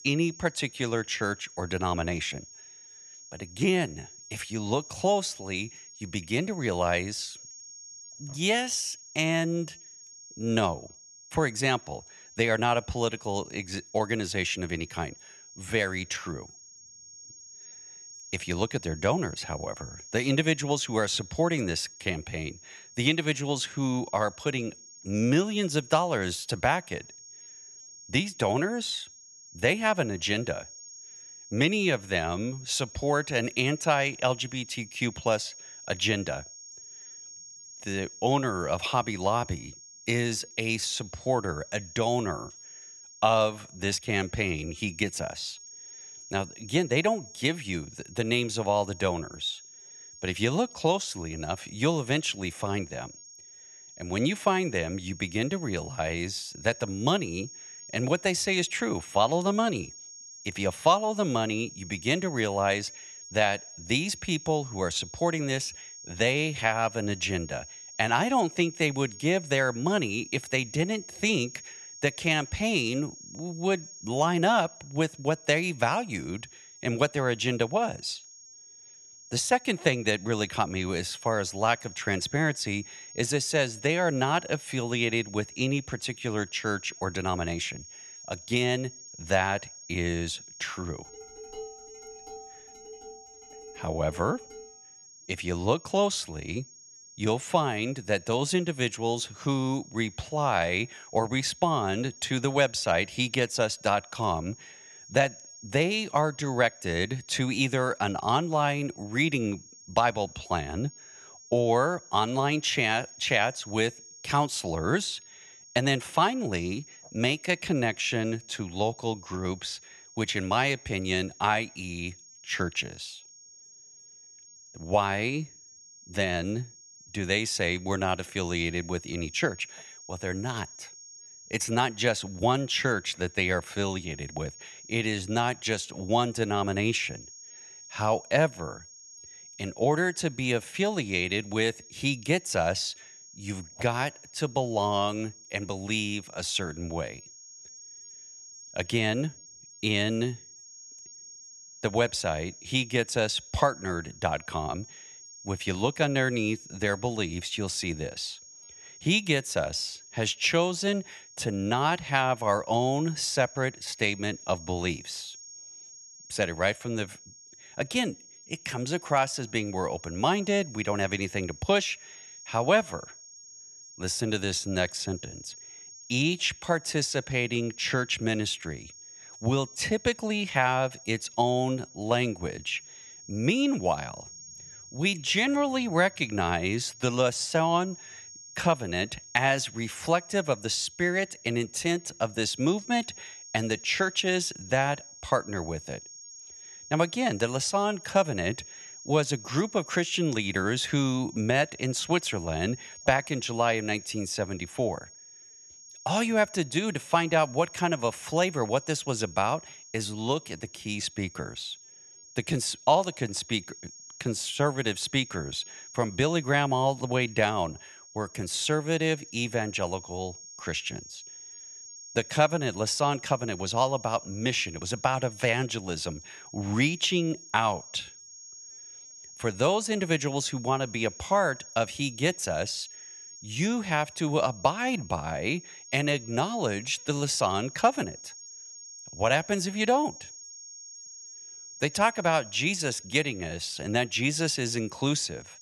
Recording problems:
high-pitched whine; noticeable; throughout; 6.5 kHz, 15 dB below the speech
clattering dishes; faint; from 1:31 to 1:35; peak 15 dB below the speech

